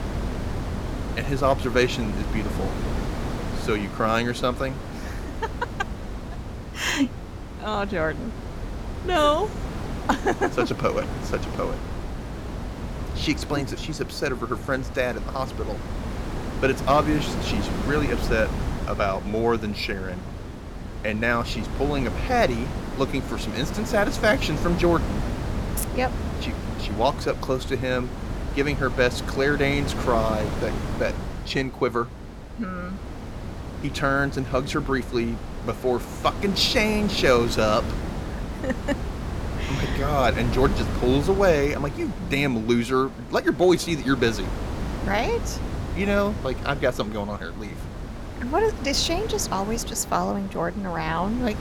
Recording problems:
wind noise on the microphone; occasional gusts; 10 dB below the speech

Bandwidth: 17.5 kHz